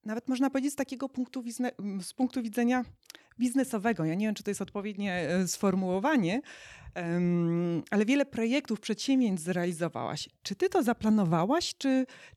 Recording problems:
none

